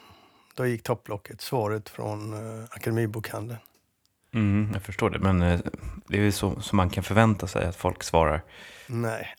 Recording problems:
none

